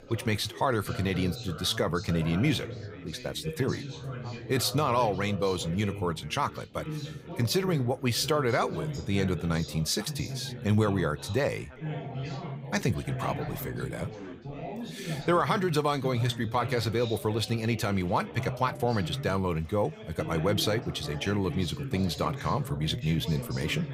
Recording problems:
background chatter; loud; throughout; 4 voices, 10 dB below the speech

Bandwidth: 15.5 kHz